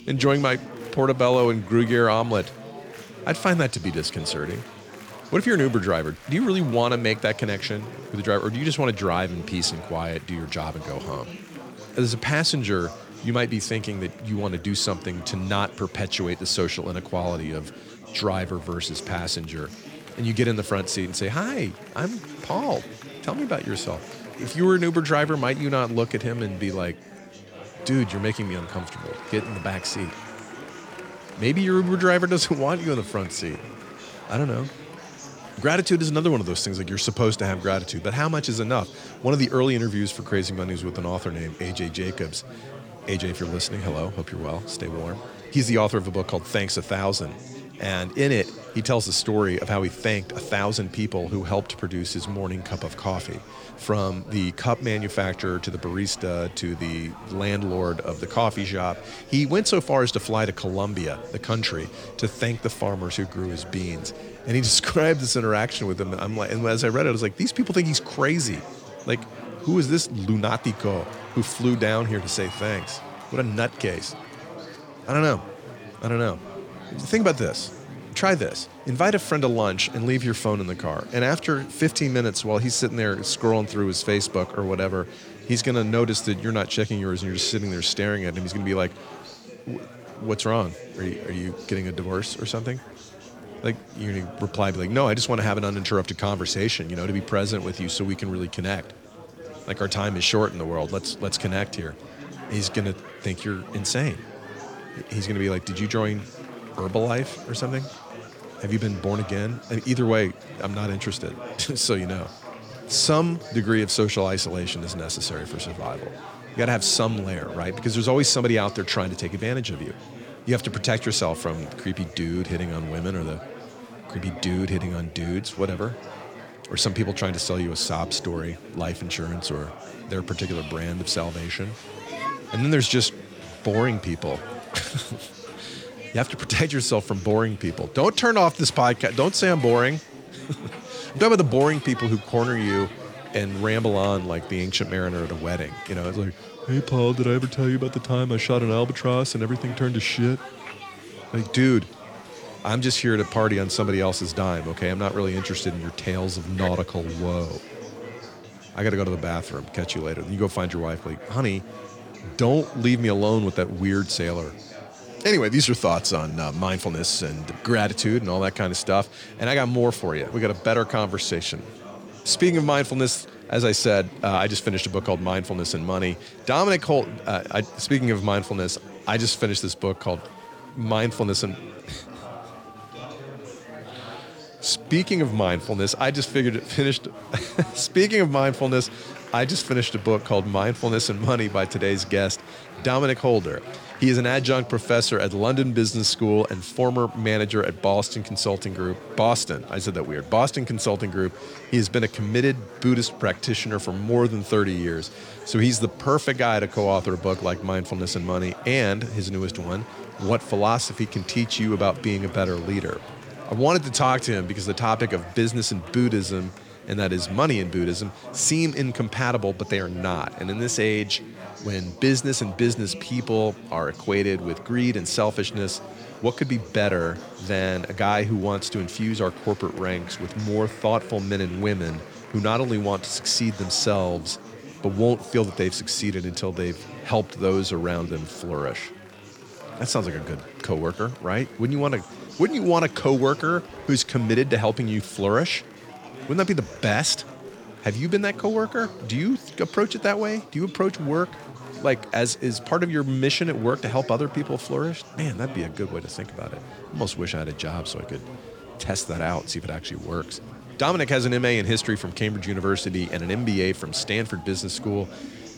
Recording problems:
chatter from many people; noticeable; throughout; 15 dB below the speech

